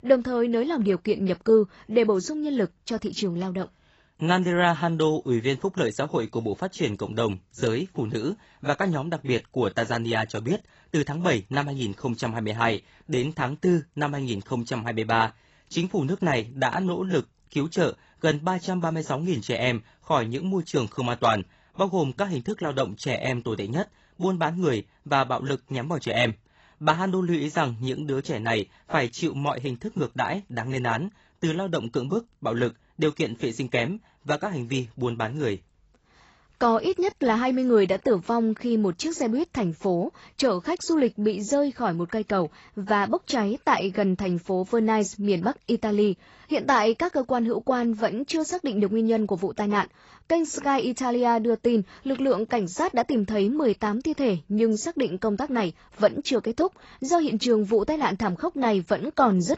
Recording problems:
garbled, watery; badly; nothing above 8 kHz

